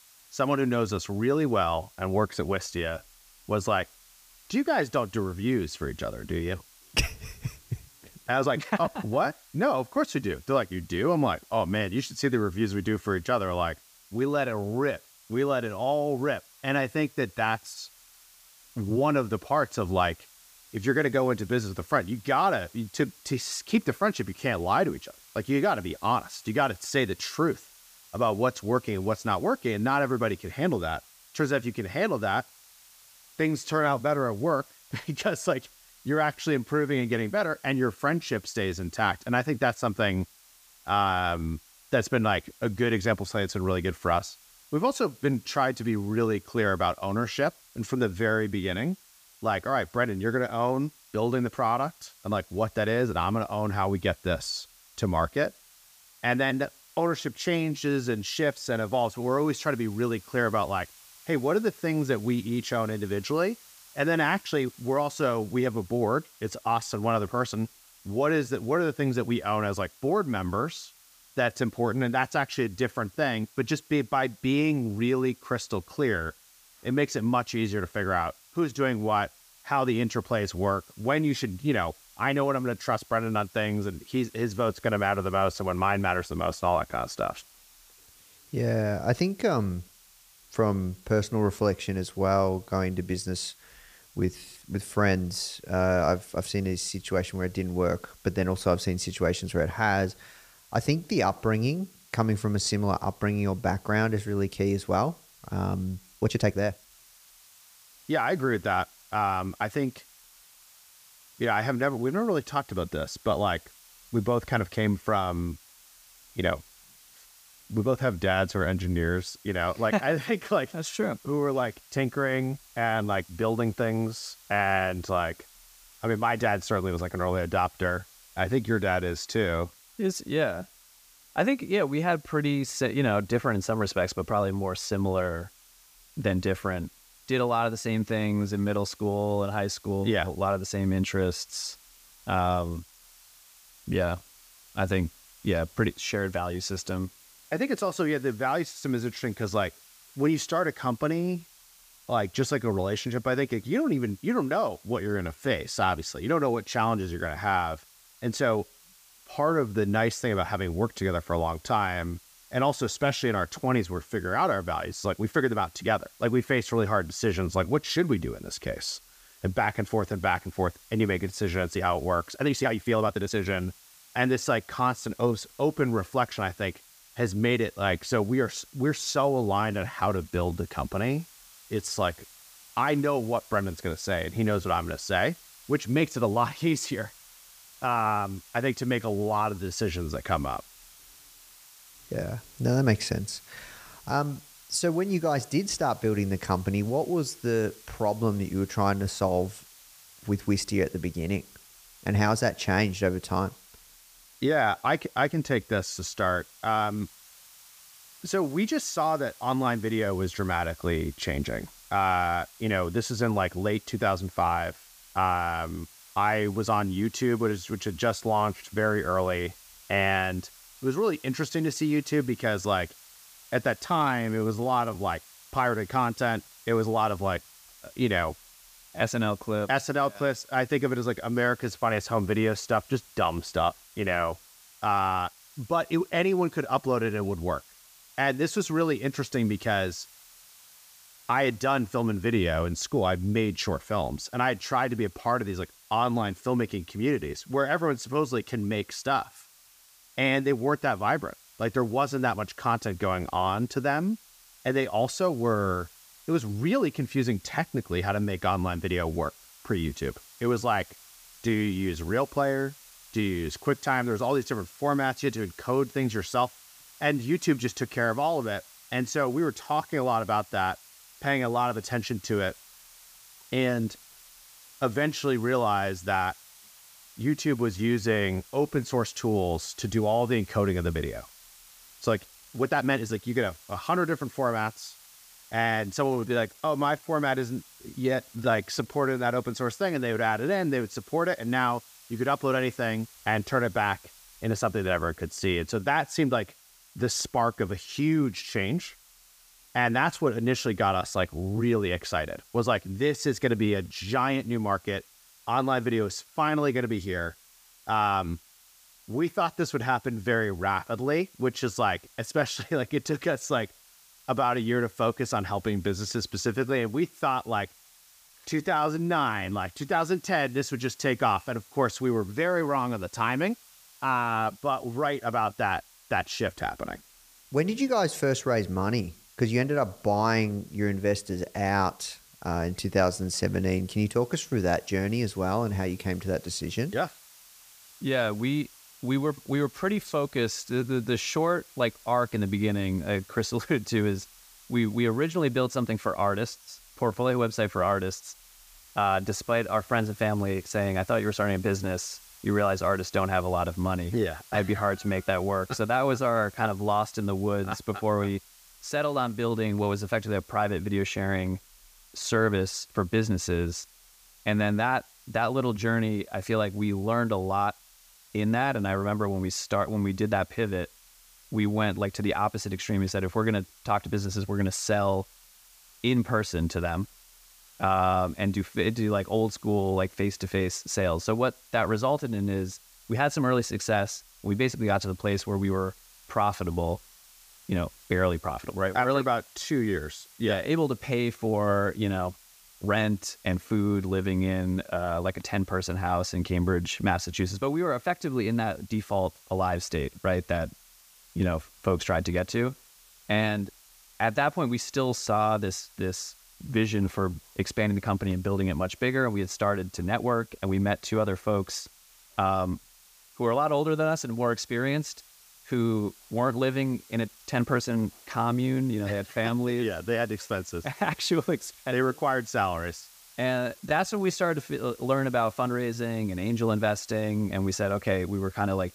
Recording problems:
hiss; faint; throughout; 25 dB below the speech
uneven, jittery; strongly; from 8 s to 7:05

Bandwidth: 15 kHz